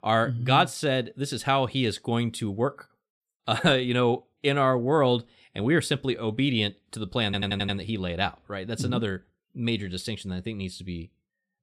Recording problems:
audio stuttering; at 7.5 s

